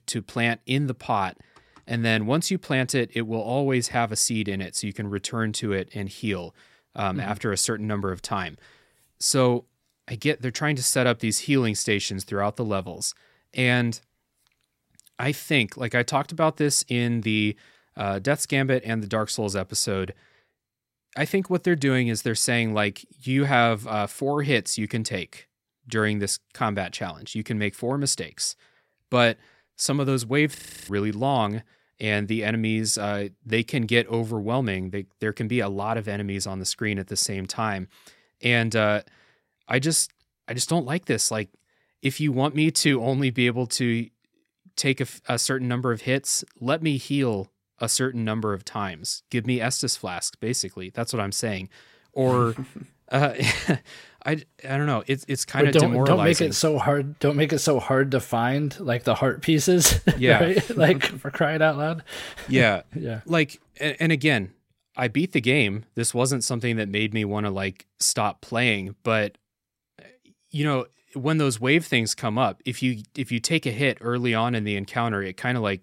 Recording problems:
audio freezing; at 31 s

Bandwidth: 16 kHz